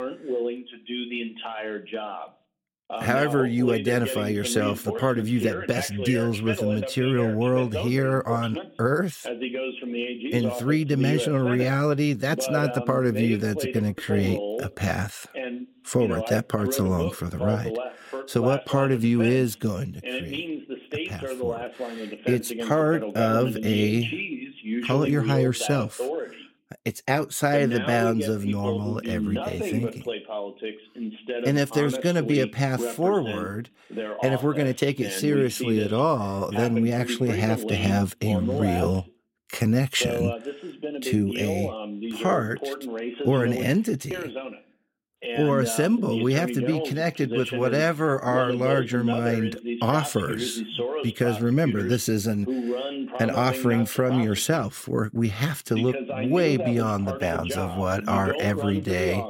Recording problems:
voice in the background; loud; throughout; 7 dB below the speech

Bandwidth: 16.5 kHz